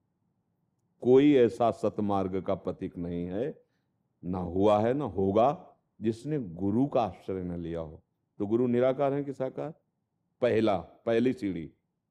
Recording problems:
muffled; slightly; fading above 1 kHz

